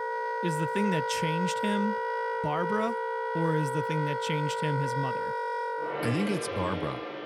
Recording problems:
background music; very loud; throughout; as loud as the speech

